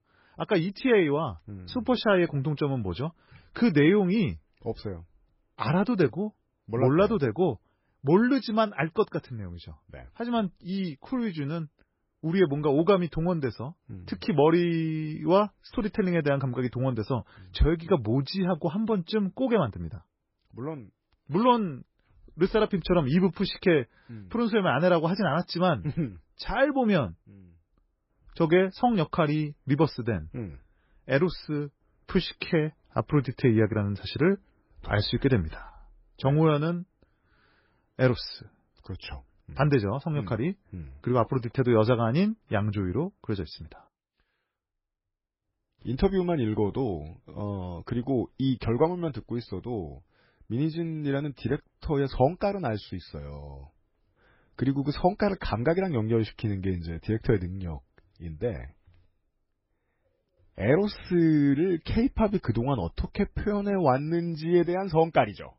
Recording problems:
garbled, watery; badly; nothing above 5.5 kHz

